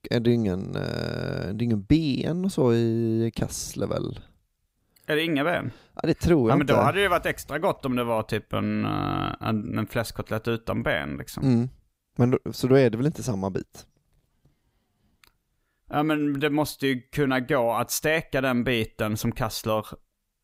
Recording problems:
none

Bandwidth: 15.5 kHz